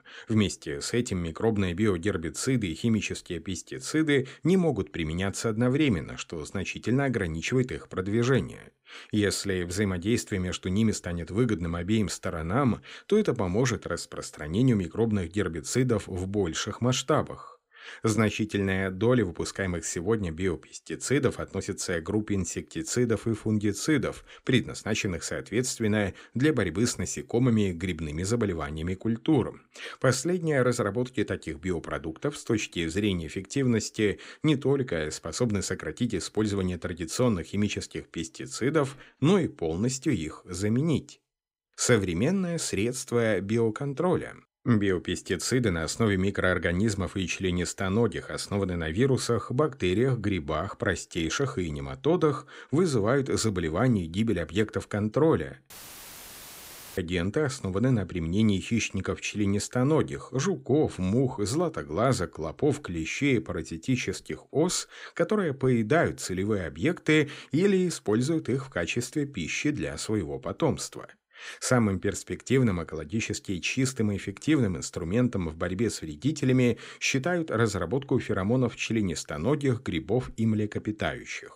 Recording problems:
audio cutting out; filled with static; at 56 s for 1.5 s

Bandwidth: 15.5 kHz